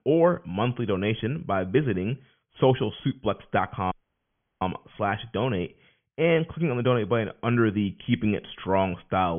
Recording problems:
high frequencies cut off; severe; nothing above 3.5 kHz
audio cutting out; at 4 s for 0.5 s
abrupt cut into speech; at the end

